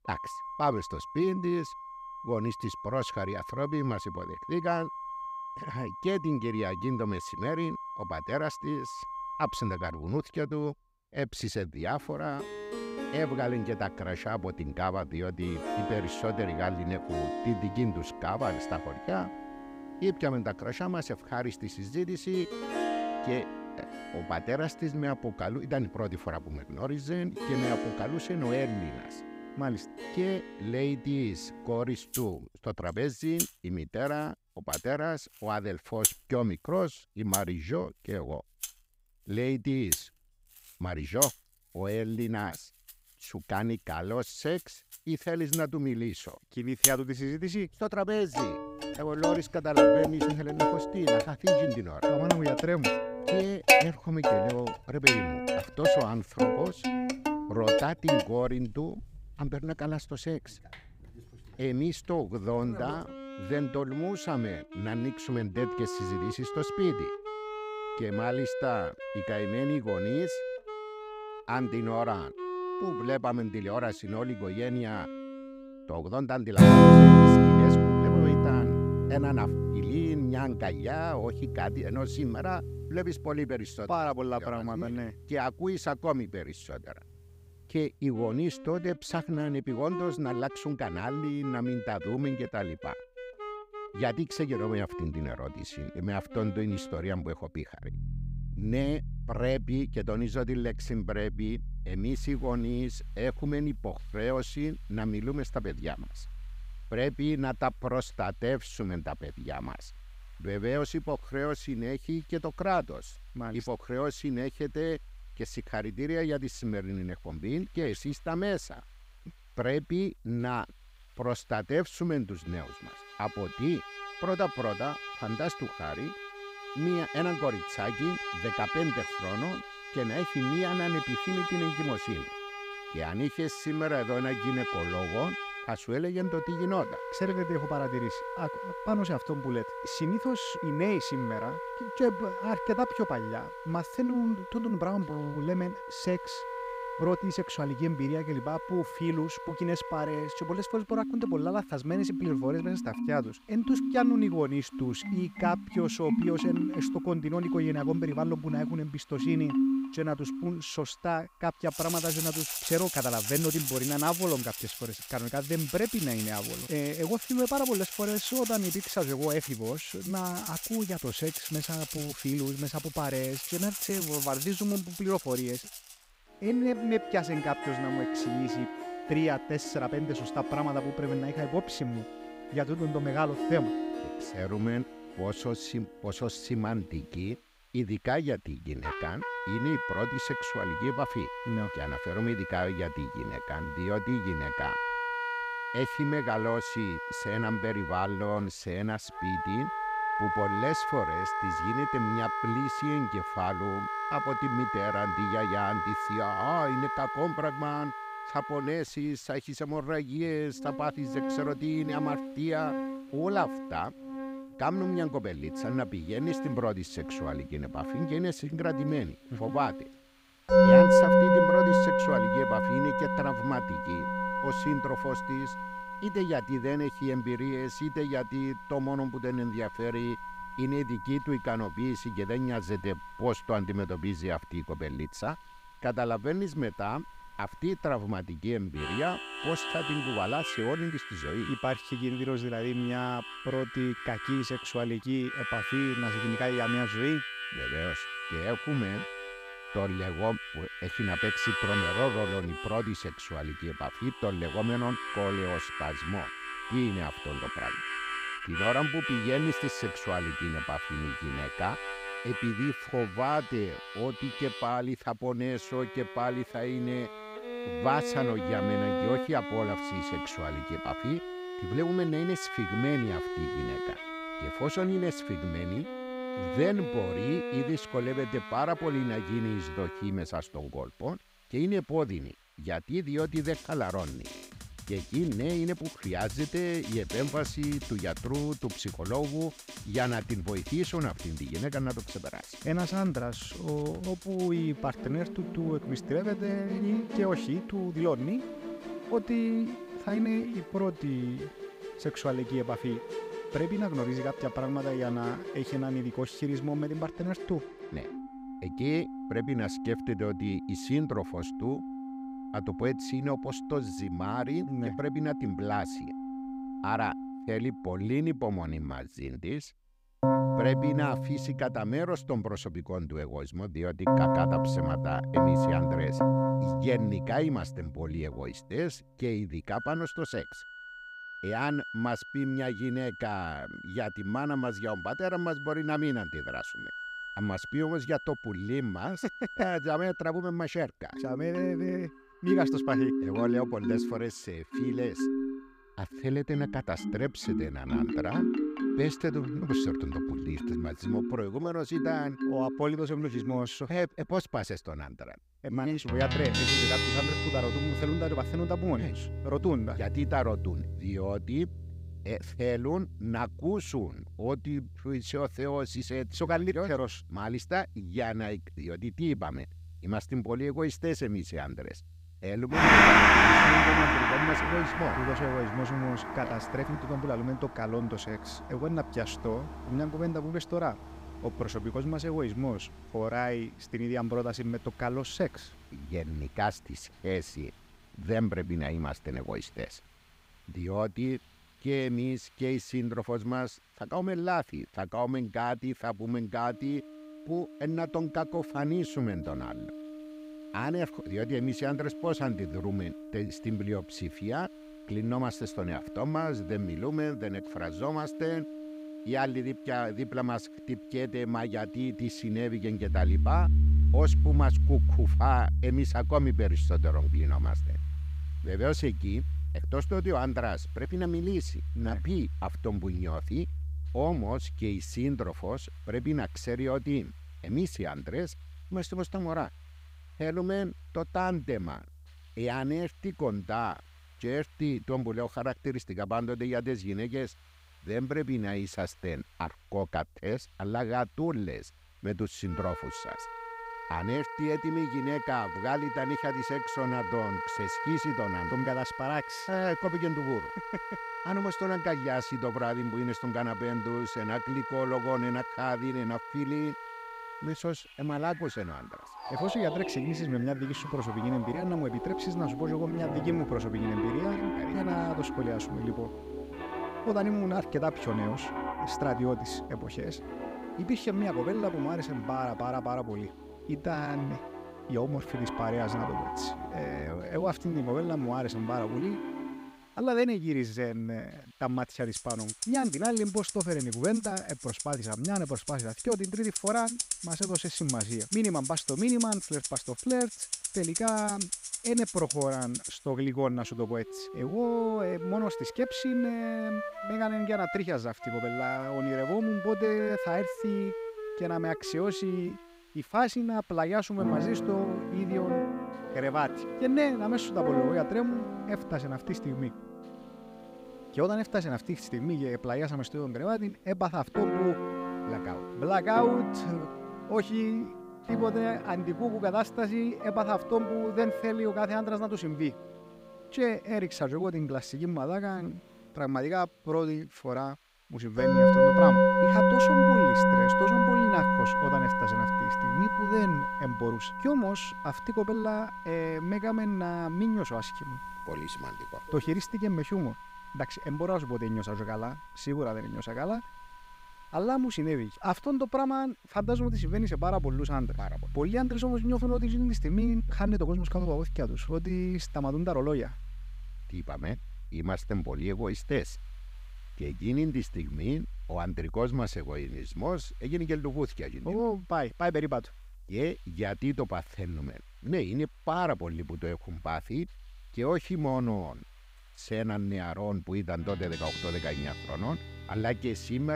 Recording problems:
background music; very loud; throughout; 2 dB above the speech
hiss; faint; from 1:42 to 5:07 and from 6:24 on; 30 dB below the speech
abrupt cut into speech; at the end

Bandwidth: 15.5 kHz